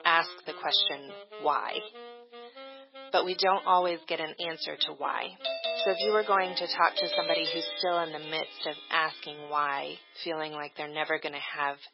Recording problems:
garbled, watery; badly; nothing above 5.5 kHz
thin; very; fading below 400 Hz
background music; noticeable; throughout; 15 dB below the speech
doorbell; loud; from 5.5 to 8 s; peak level with the speech

